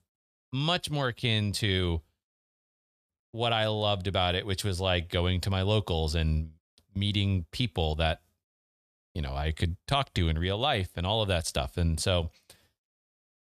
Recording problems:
none

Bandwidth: 14.5 kHz